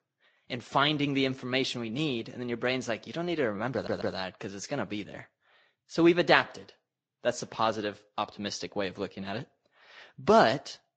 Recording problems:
garbled, watery; slightly; nothing above 7.5 kHz
audio stuttering; at 3.5 s

